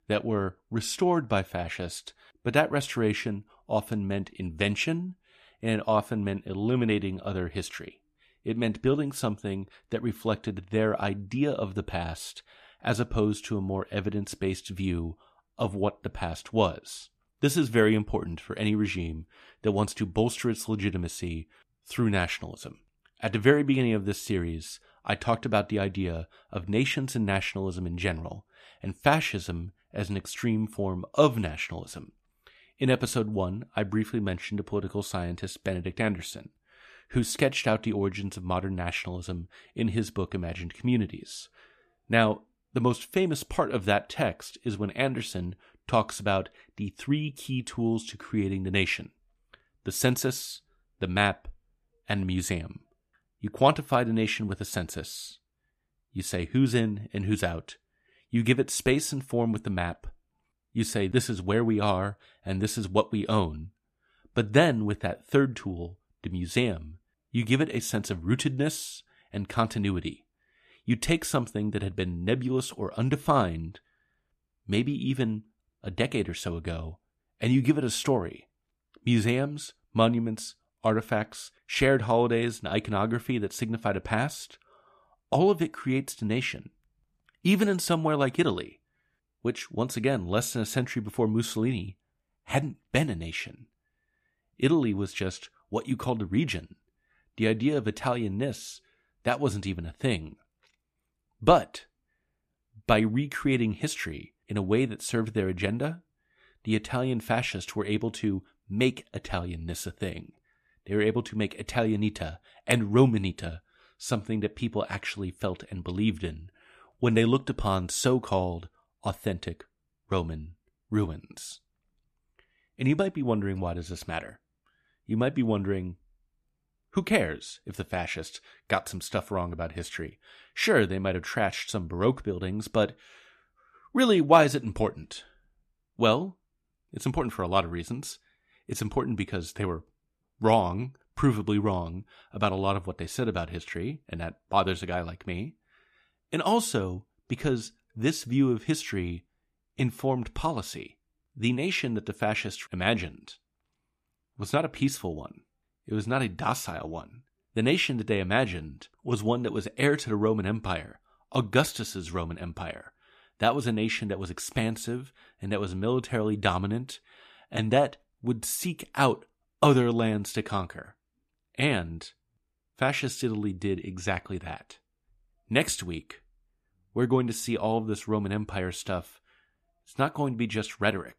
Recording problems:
none

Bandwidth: 14.5 kHz